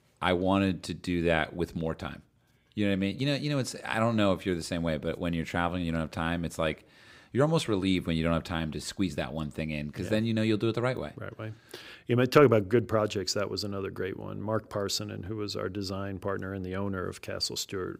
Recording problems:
none

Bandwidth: 15.5 kHz